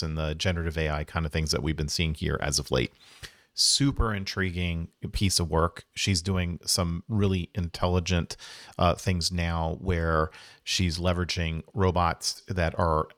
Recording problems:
abrupt cut into speech; at the start

